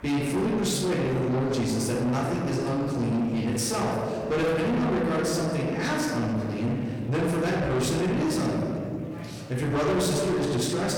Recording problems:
distortion; heavy; 8 dB below the speech
off-mic speech; far
room echo; noticeable; dies away in 1.9 s
murmuring crowd; noticeable; throughout; 20 dB below the speech

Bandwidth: 18.5 kHz